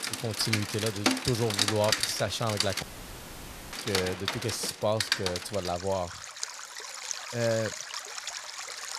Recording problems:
rain or running water; loud; throughout; 1 dB below the speech
audio cutting out; at 3 s for 1 s

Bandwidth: 14.5 kHz